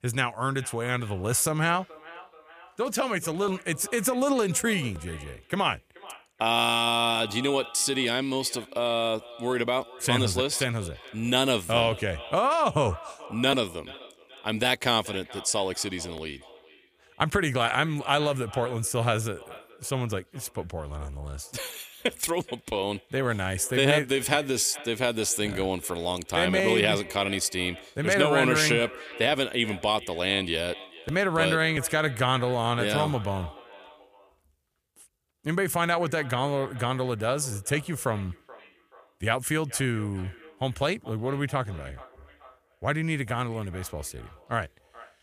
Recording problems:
echo of what is said; faint; throughout; 430 ms later, 20 dB below the speech

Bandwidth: 15 kHz